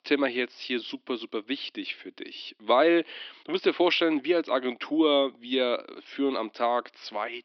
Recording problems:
thin; somewhat; fading below 300 Hz
high frequencies cut off; noticeable; nothing above 5.5 kHz

